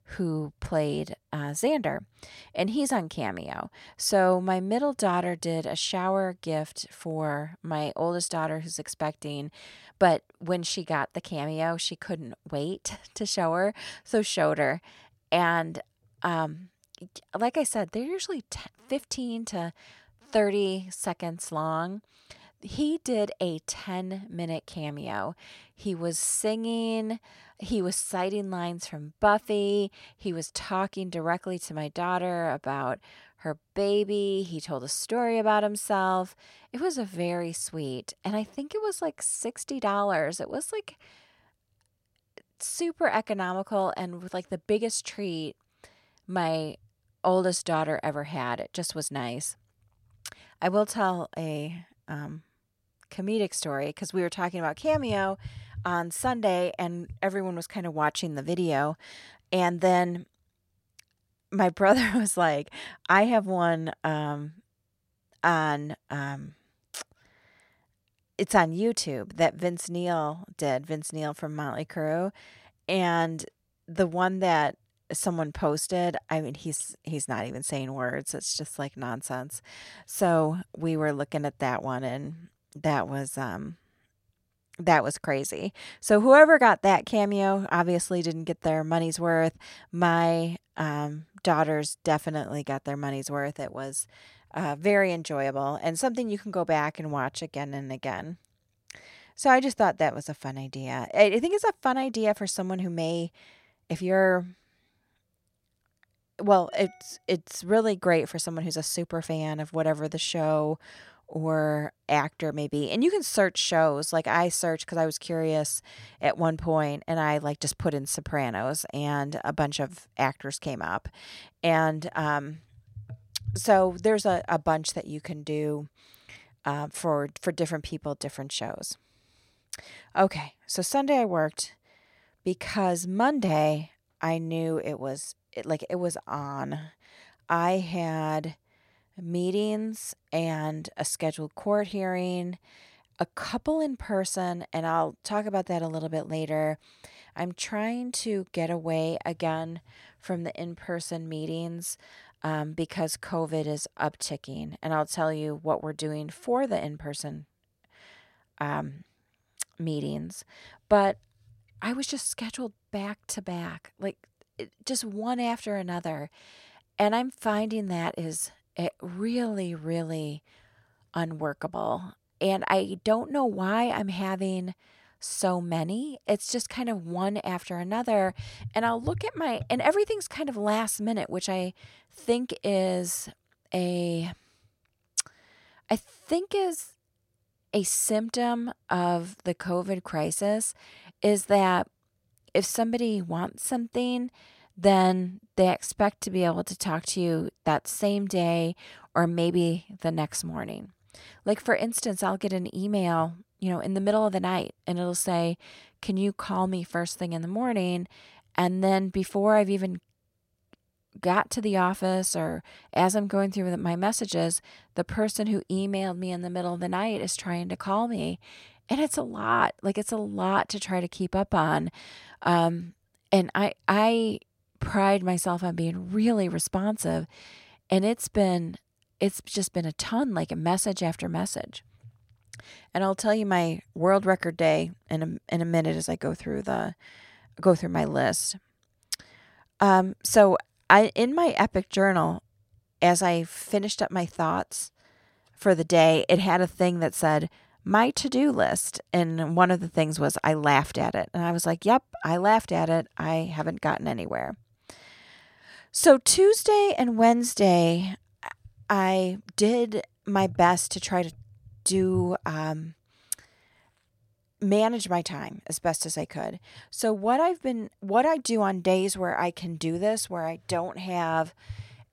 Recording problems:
none

